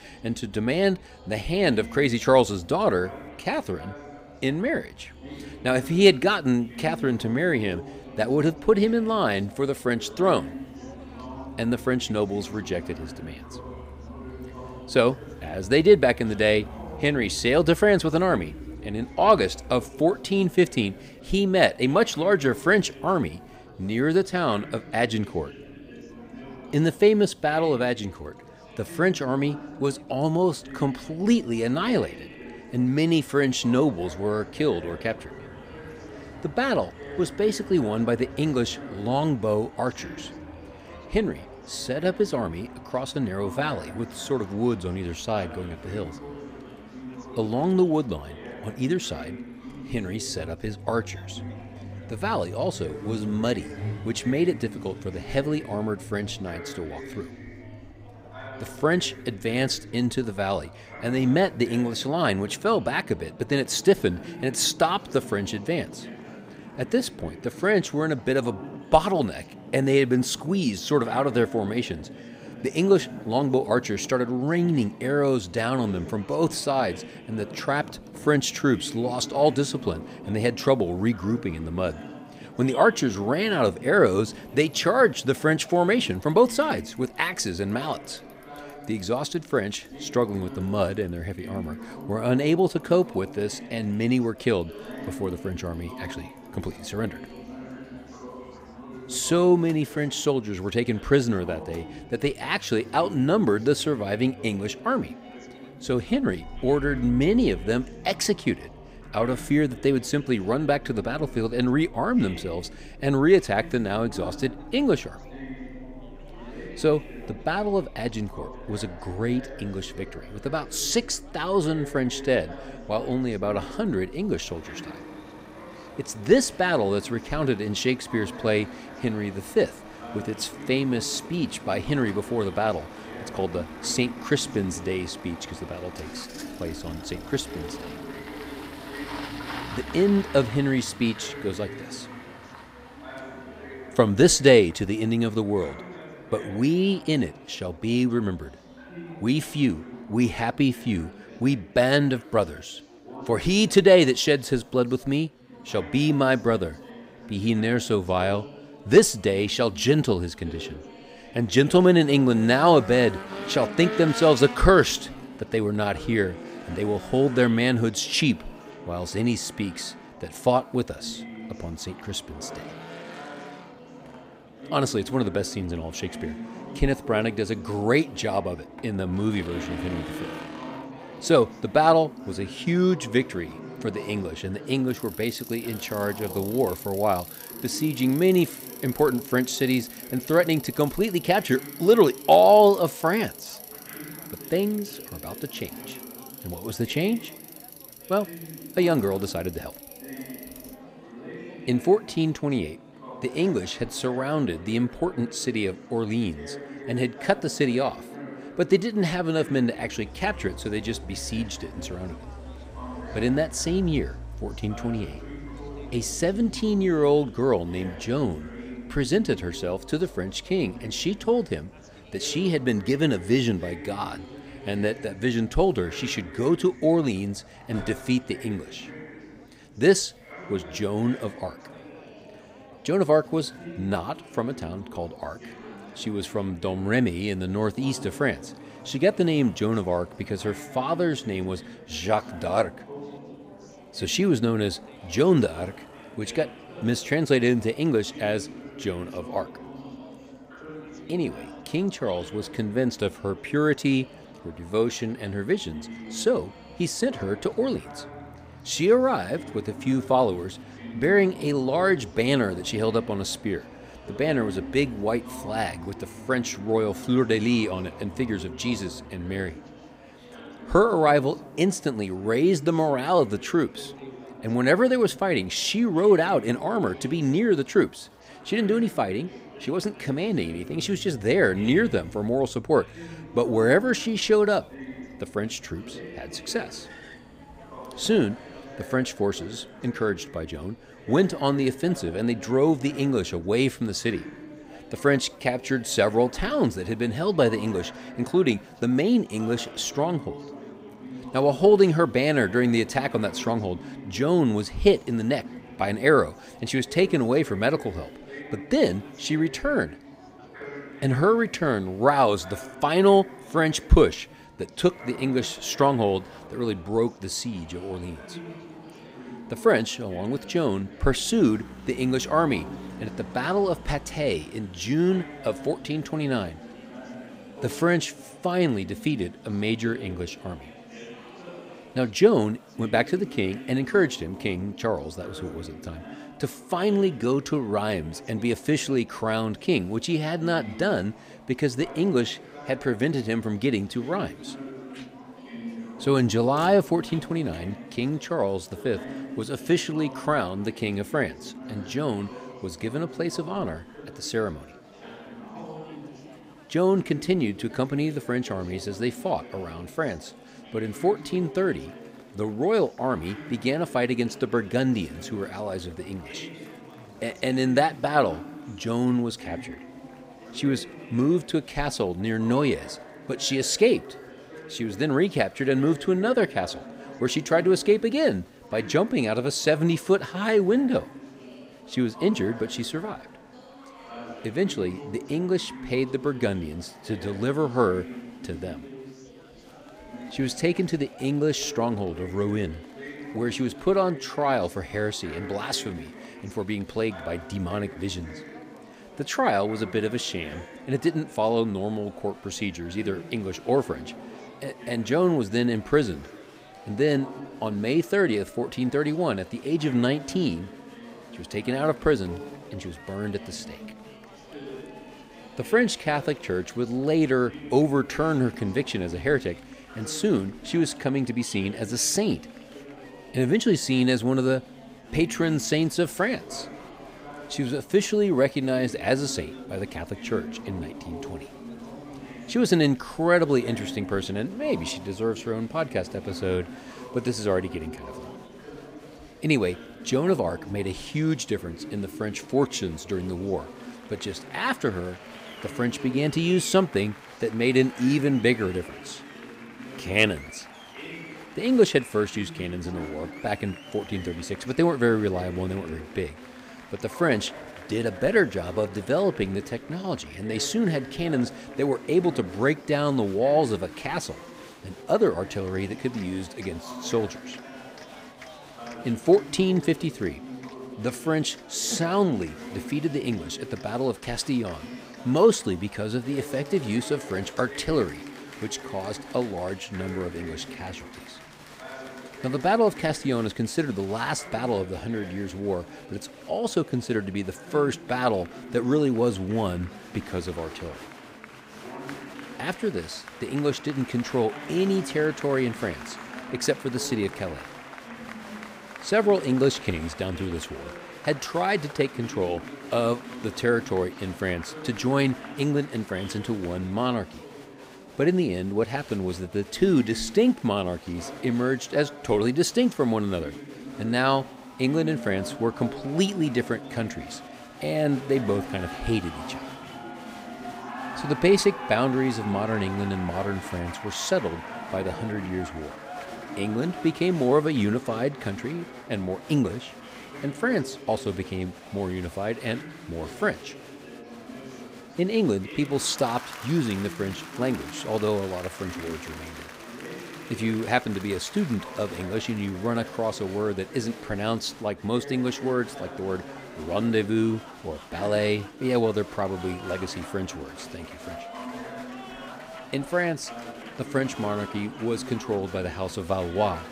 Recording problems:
chatter from many people; noticeable; throughout; 15 dB below the speech
traffic noise; faint; throughout; 20 dB below the speech

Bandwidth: 15.5 kHz